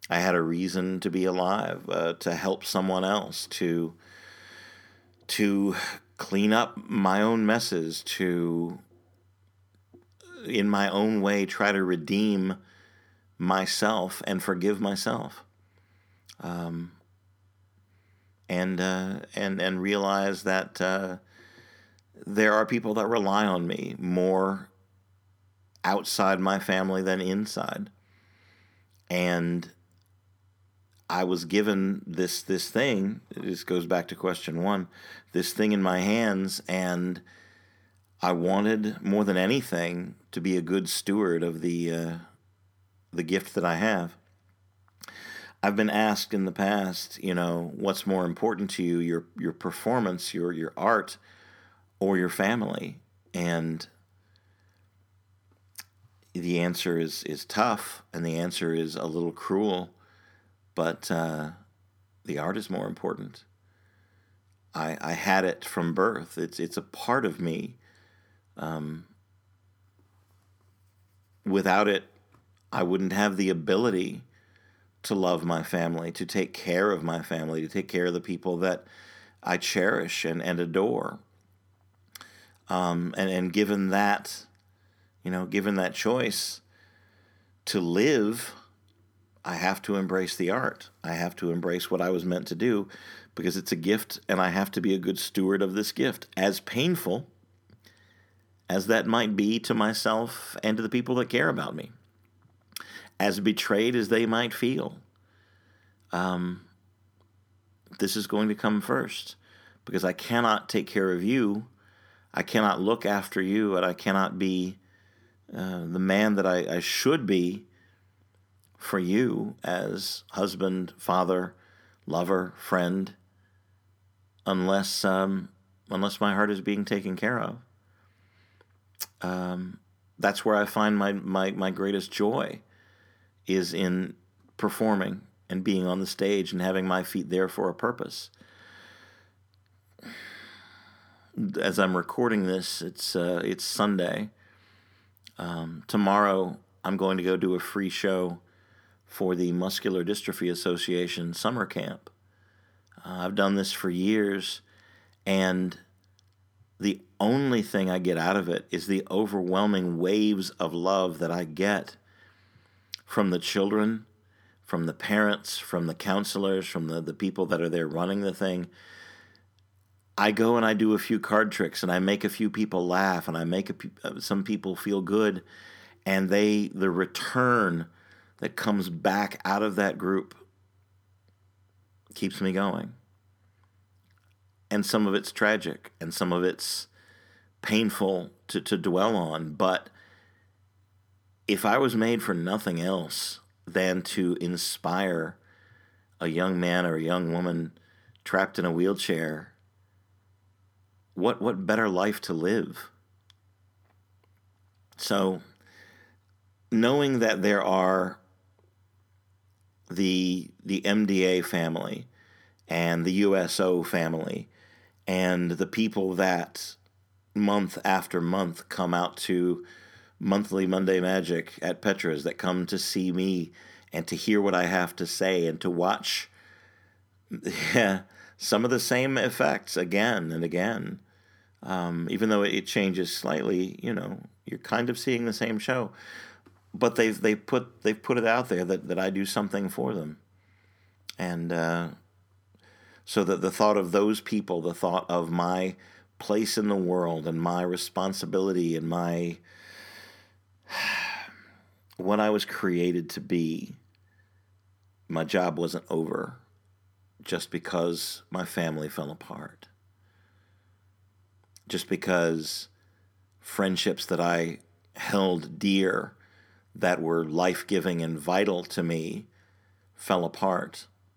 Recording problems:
none

